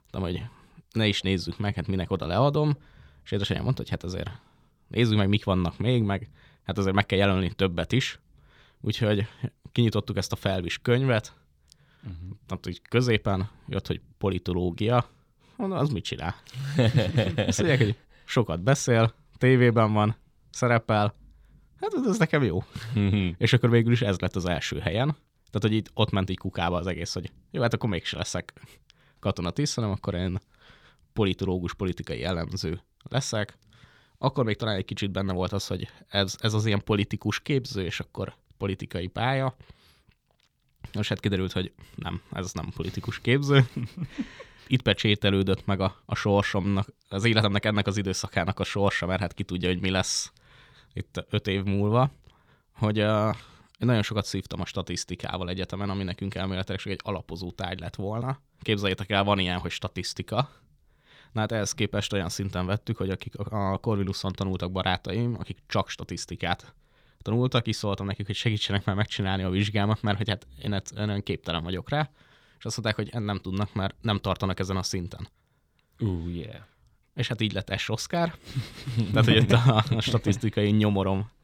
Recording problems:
none

